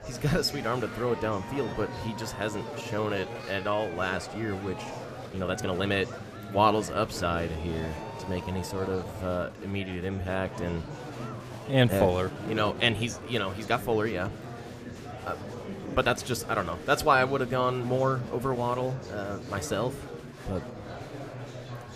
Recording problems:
murmuring crowd; loud; throughout; 10 dB below the speech
uneven, jittery; strongly; from 2.5 to 16 s

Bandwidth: 14.5 kHz